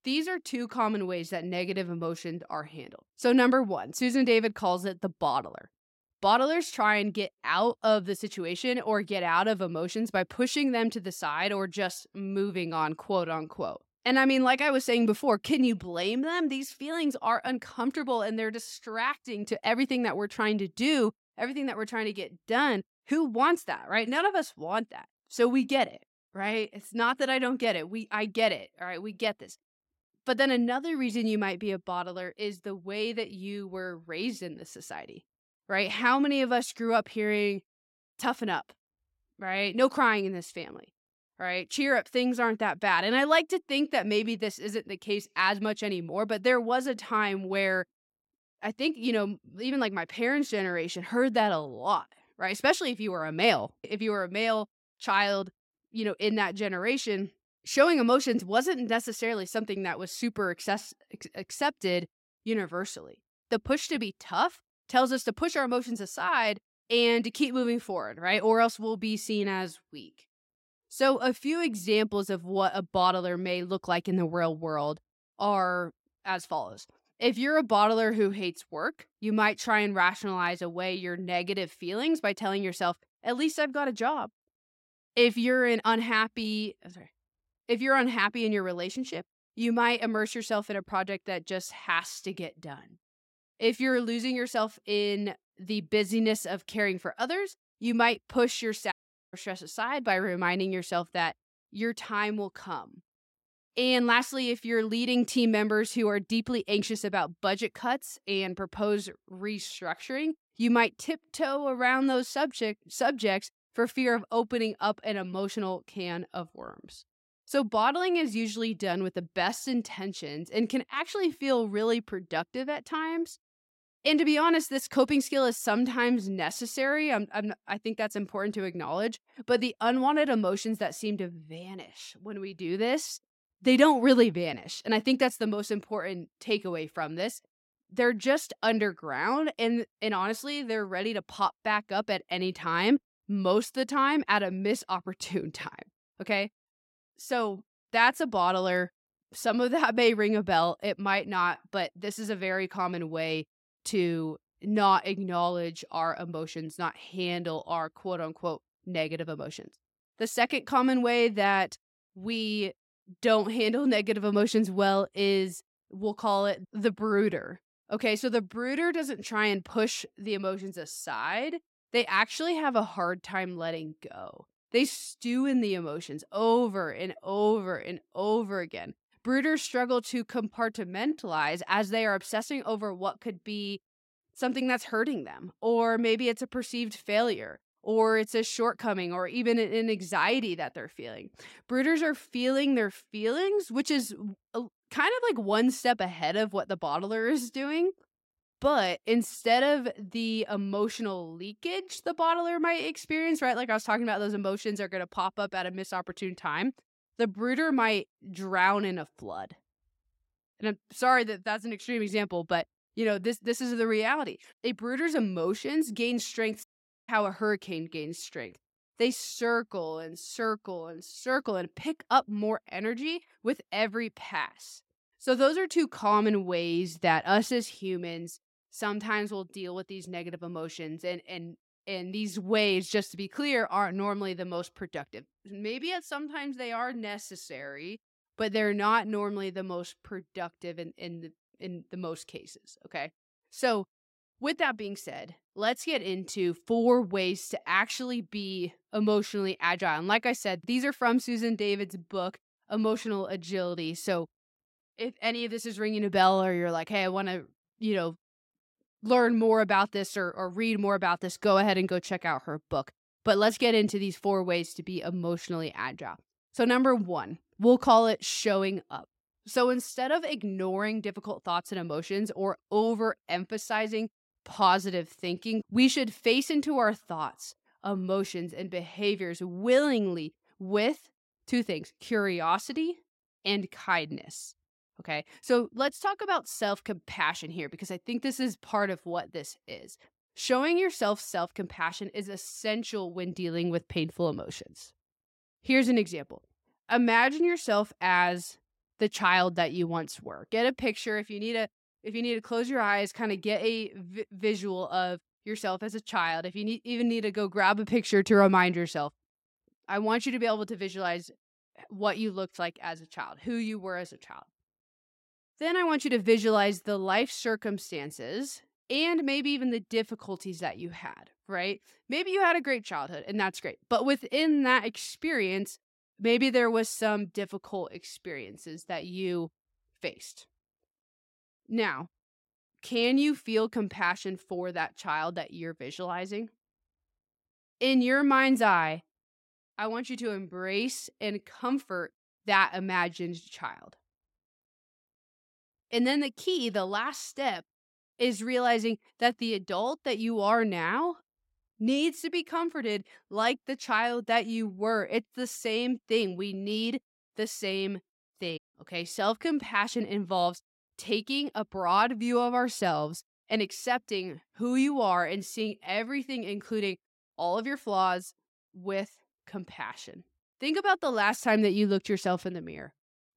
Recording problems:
audio cutting out; at 1:39, at 3:37 and at 5:59

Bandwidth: 16 kHz